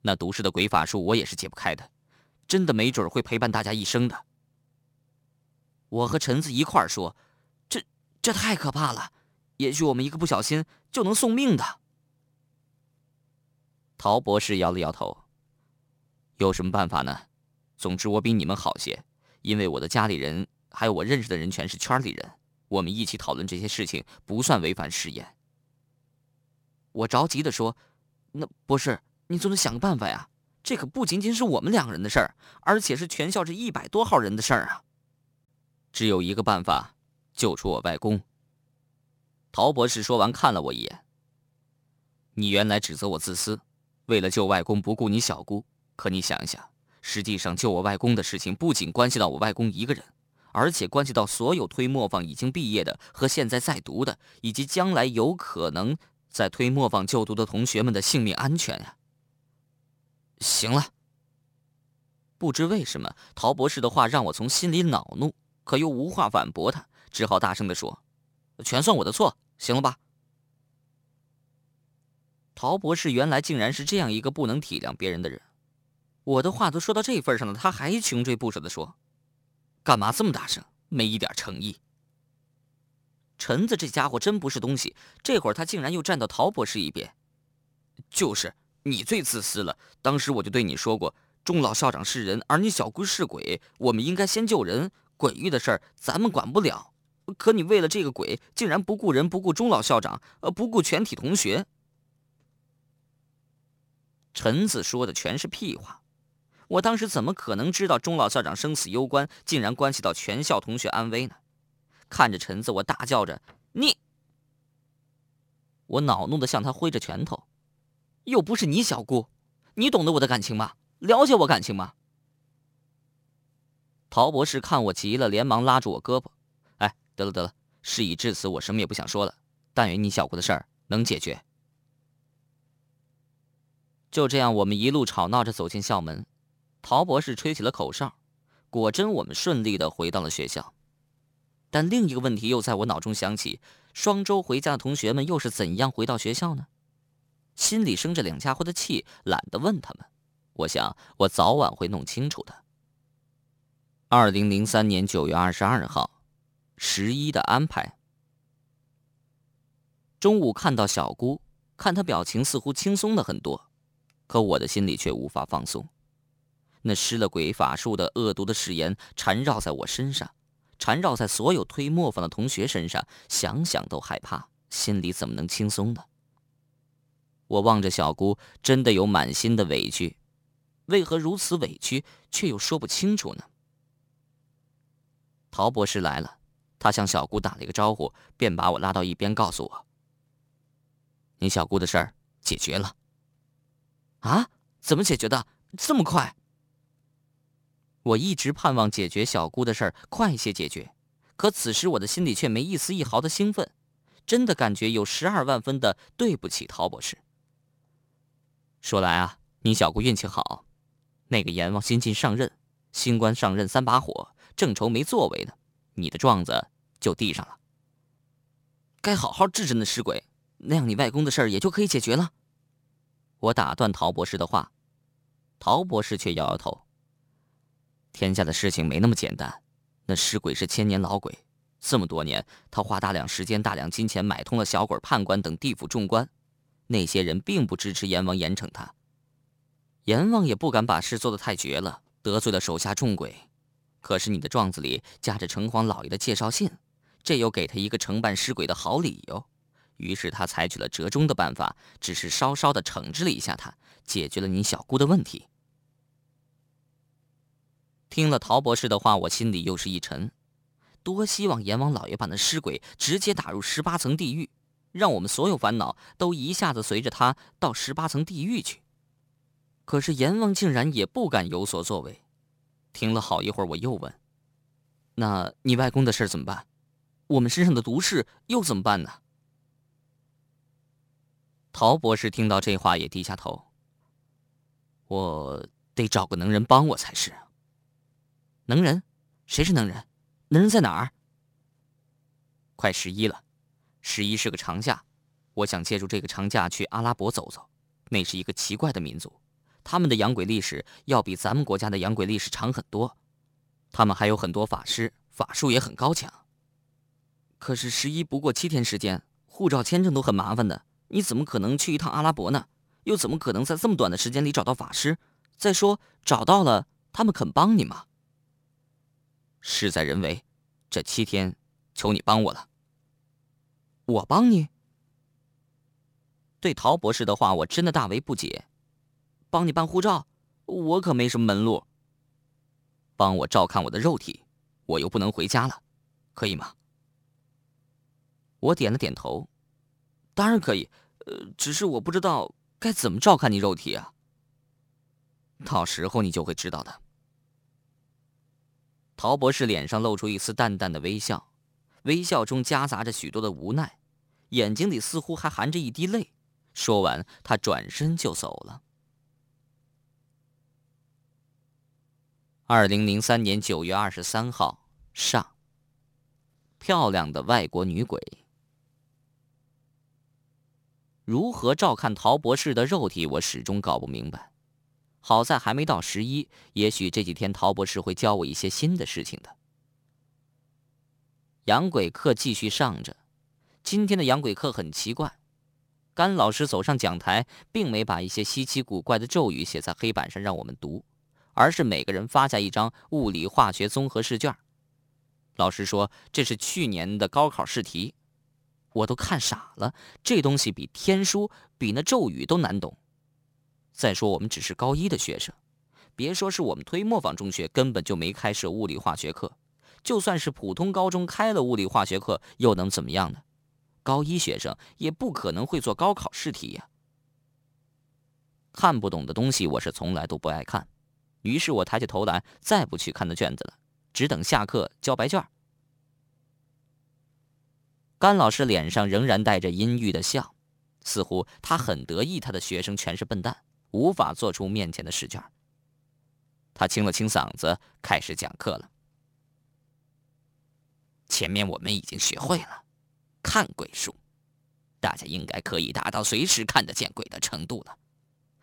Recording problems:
none

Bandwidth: 18.5 kHz